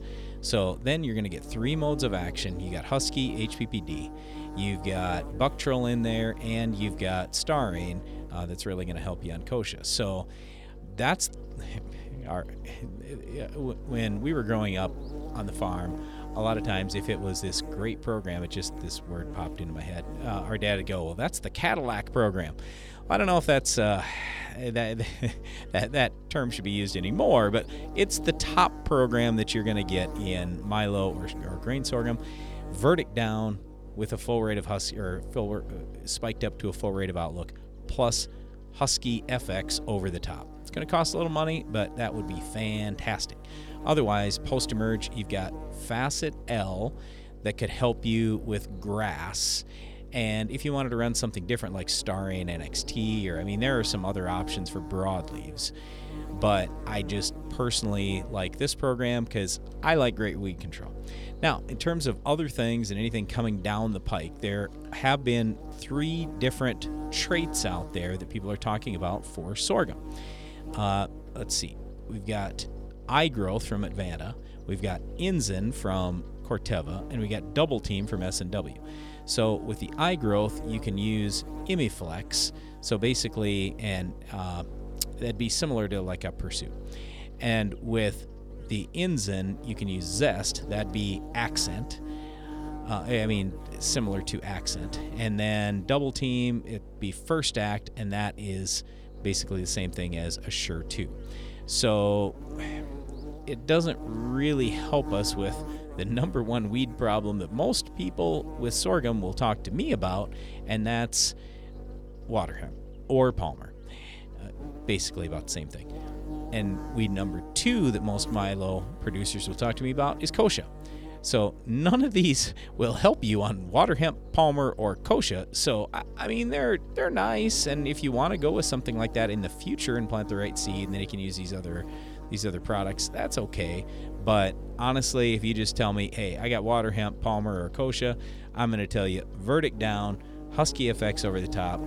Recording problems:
electrical hum; noticeable; throughout; 50 Hz, 15 dB below the speech

